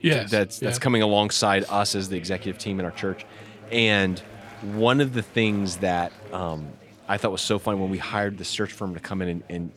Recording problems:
chatter from many people; faint; throughout; 20 dB below the speech

